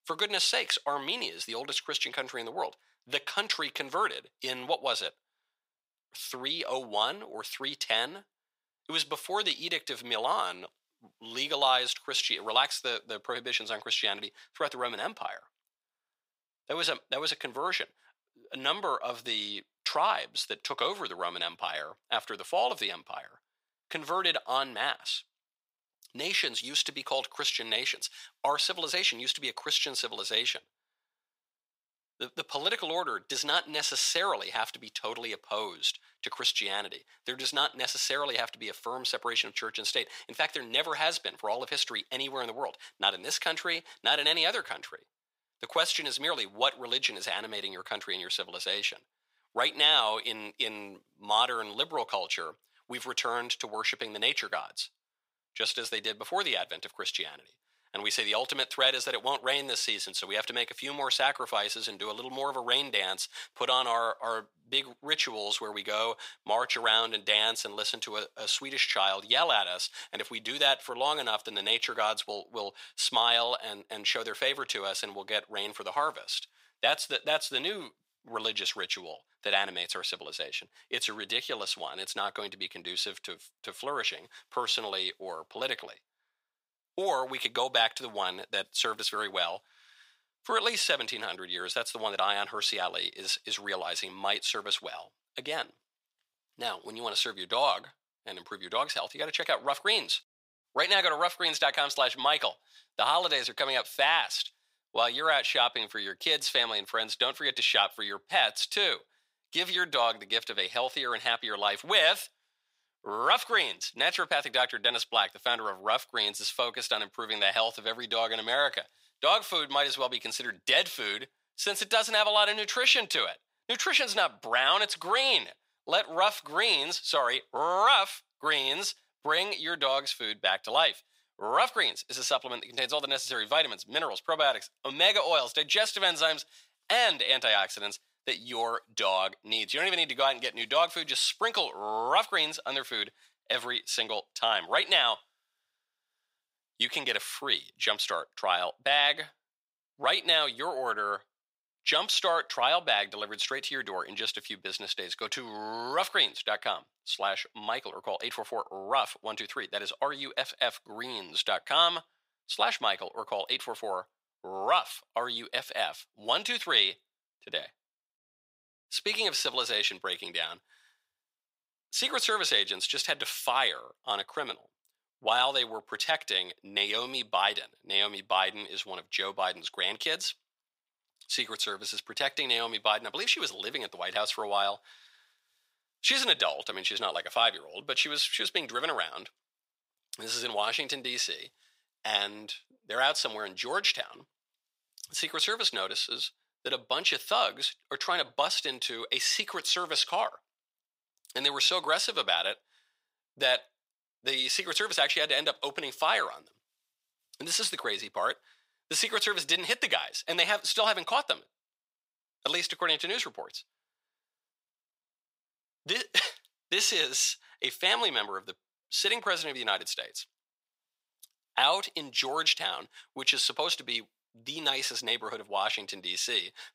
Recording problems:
thin; very; fading below 650 Hz

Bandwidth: 15.5 kHz